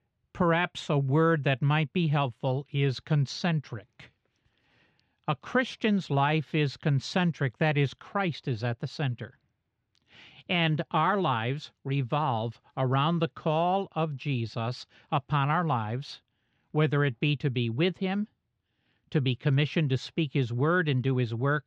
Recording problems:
muffled; slightly; fading above 3.5 kHz

